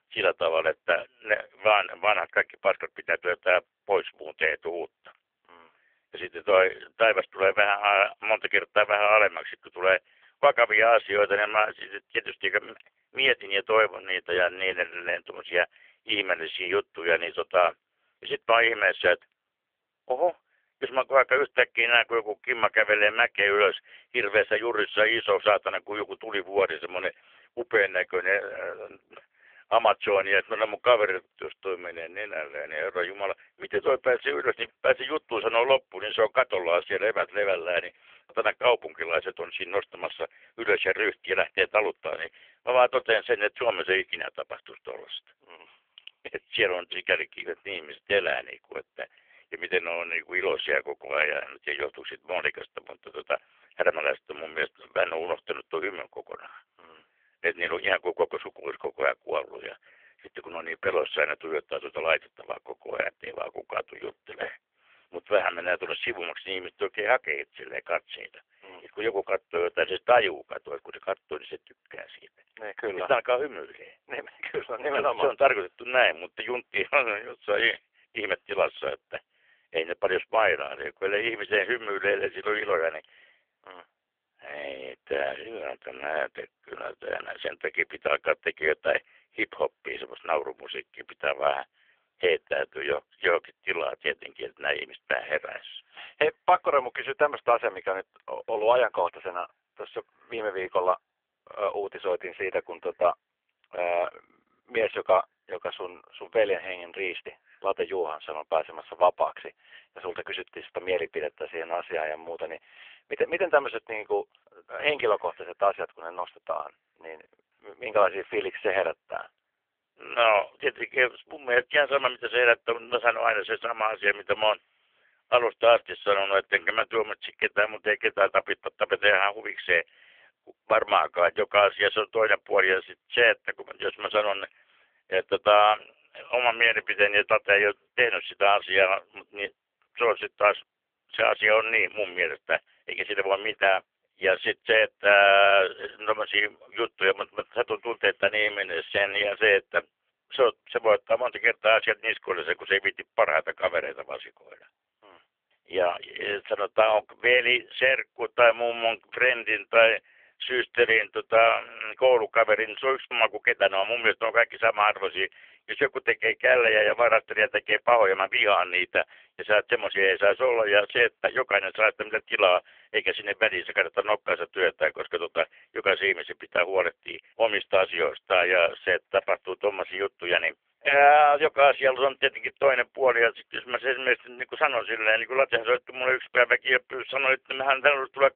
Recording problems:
phone-call audio; poor line; nothing above 3 kHz

